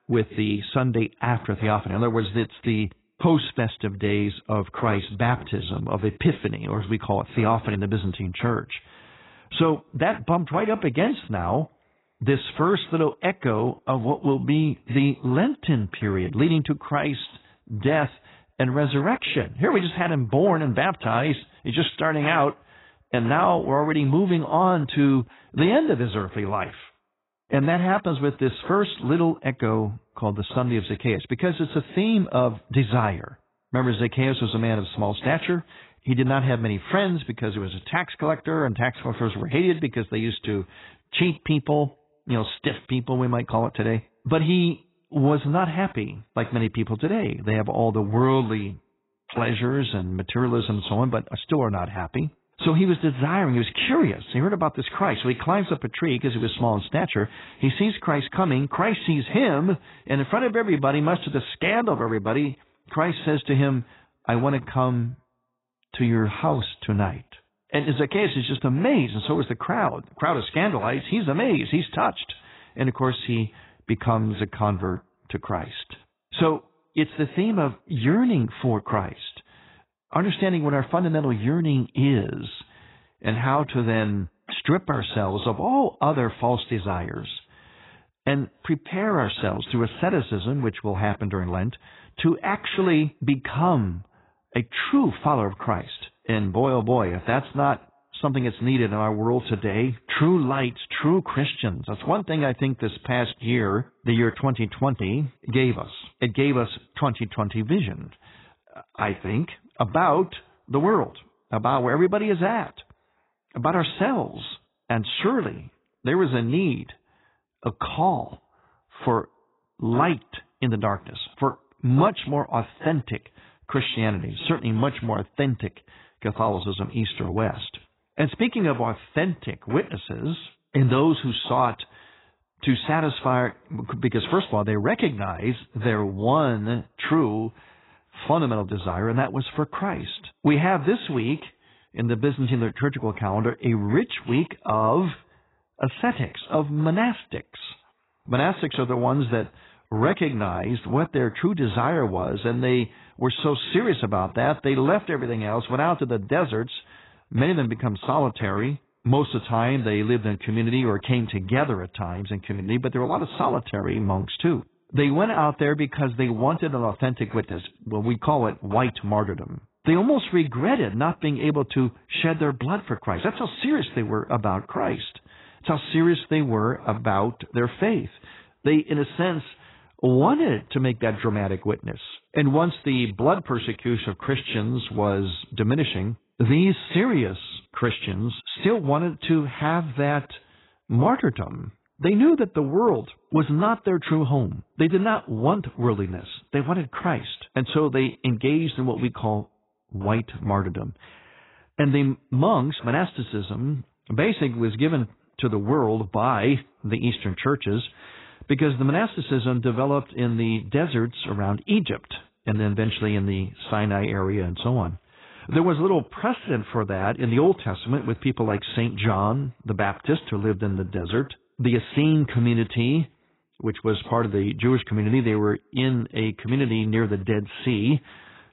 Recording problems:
garbled, watery; badly; nothing above 4 kHz

